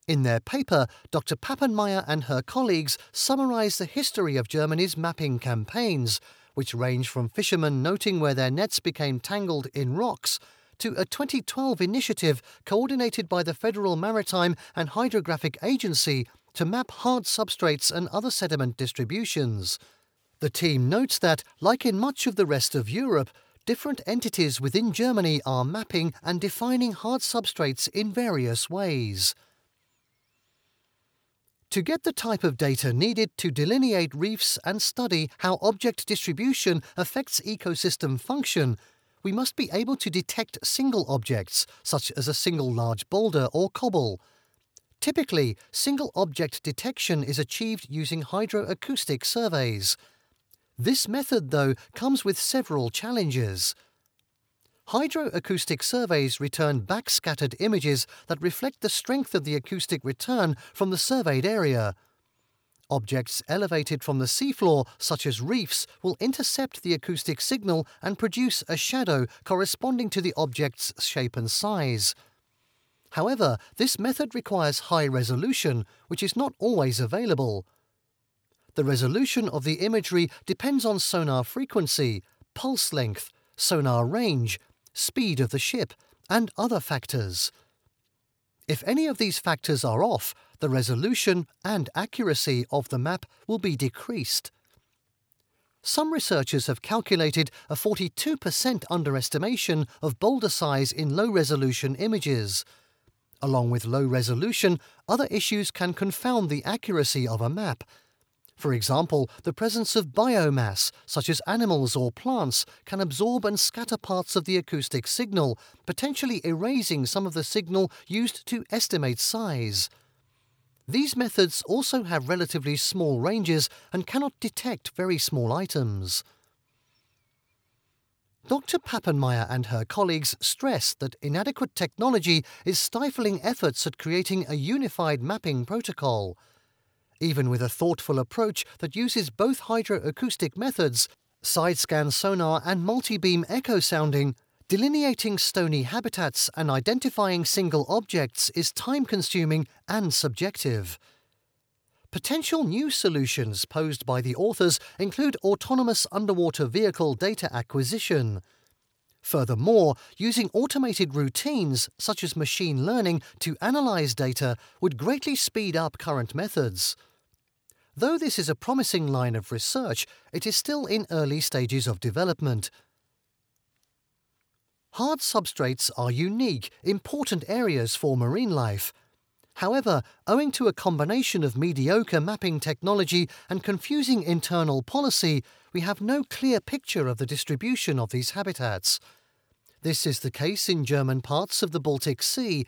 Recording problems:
none

